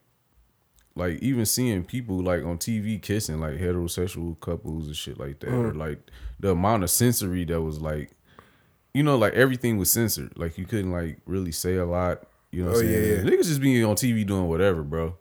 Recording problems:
none

